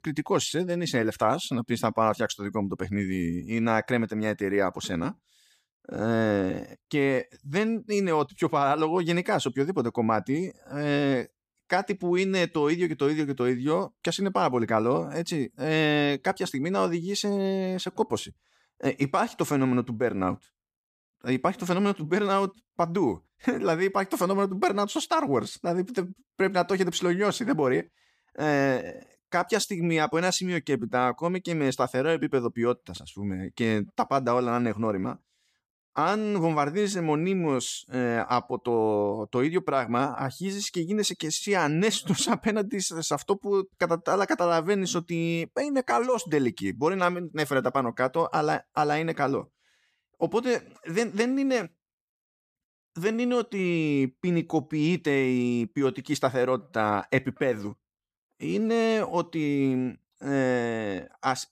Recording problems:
none

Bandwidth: 14.5 kHz